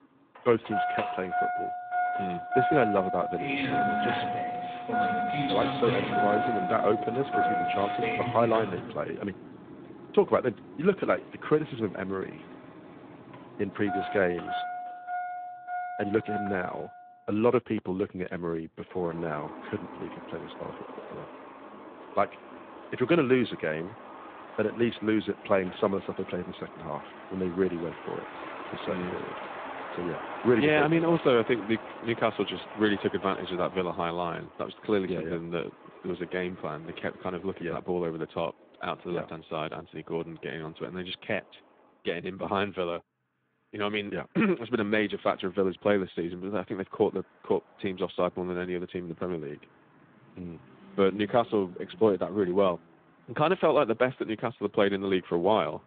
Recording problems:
phone-call audio; nothing above 3.5 kHz
traffic noise; loud; throughout; 5 dB below the speech

